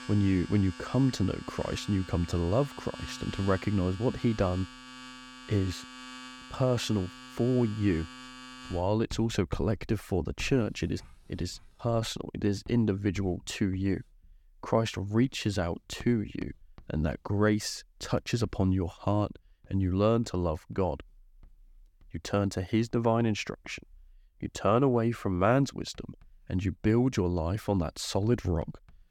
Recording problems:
household noises; noticeable; throughout; 15 dB below the speech

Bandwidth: 17.5 kHz